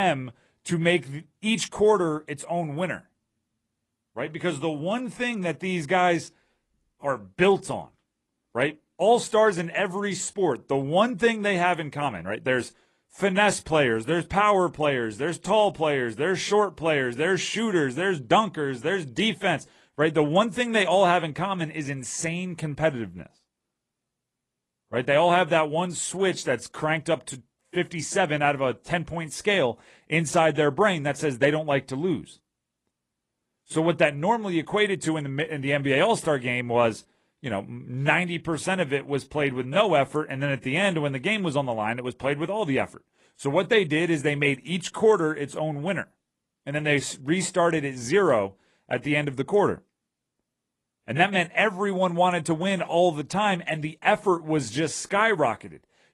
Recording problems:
garbled, watery; slightly
abrupt cut into speech; at the start

